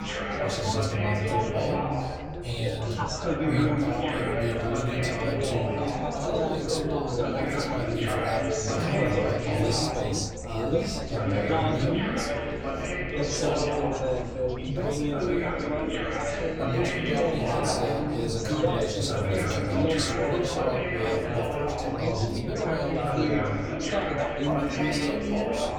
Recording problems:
off-mic speech; far
room echo; slight; dies away in 0.6 s
chatter from many people; very loud; throughout; 2 dB above the speech
low rumble; faint; throughout; 20 dB below the speech

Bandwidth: 18 kHz